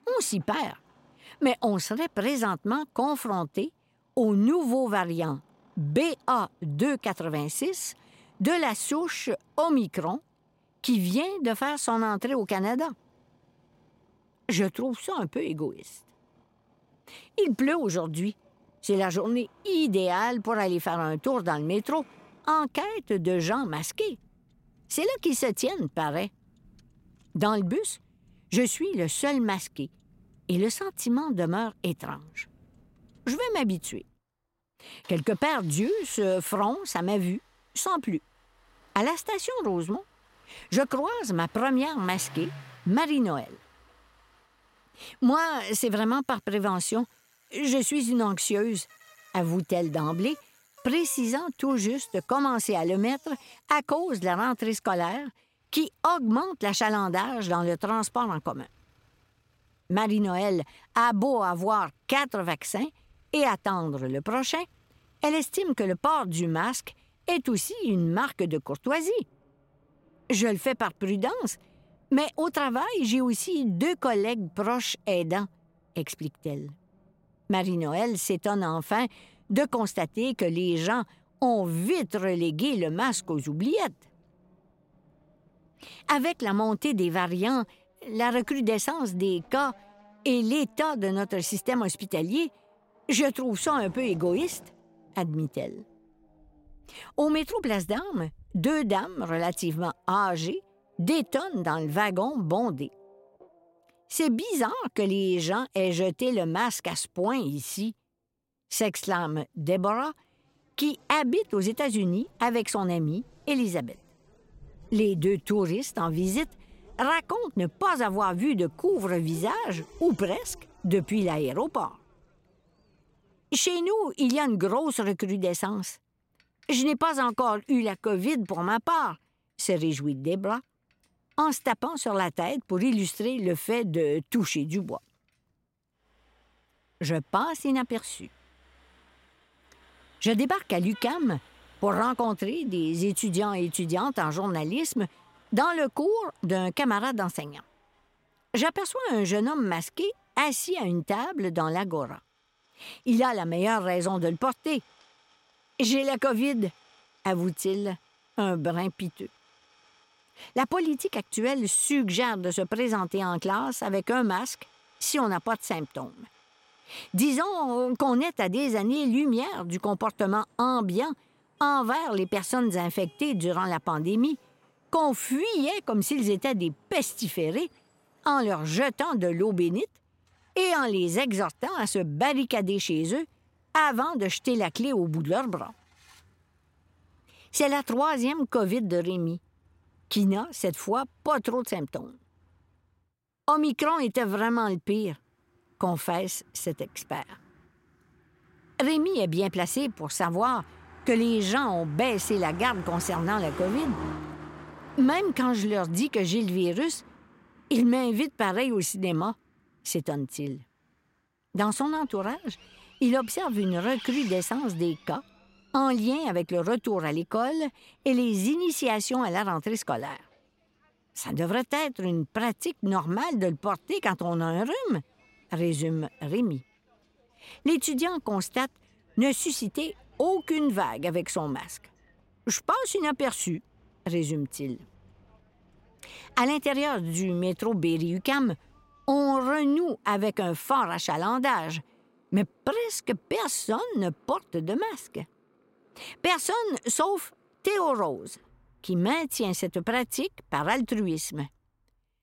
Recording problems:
traffic noise; faint; throughout; 25 dB below the speech

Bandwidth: 16 kHz